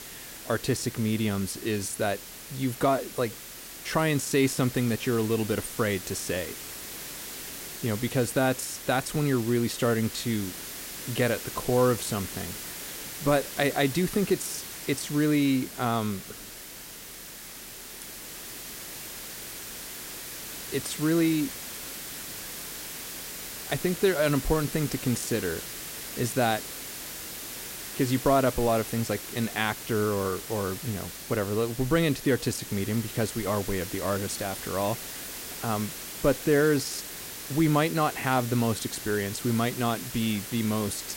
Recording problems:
hiss; loud; throughout; 9 dB below the speech

